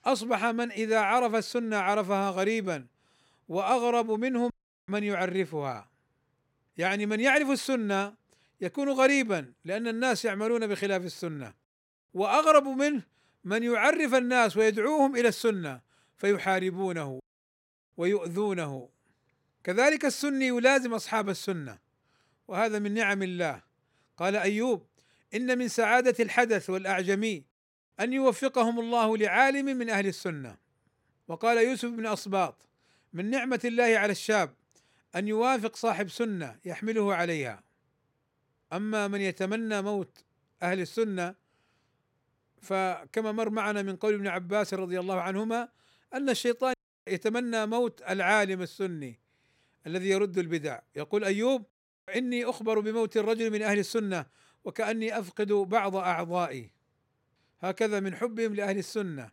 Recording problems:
none

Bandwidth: 16 kHz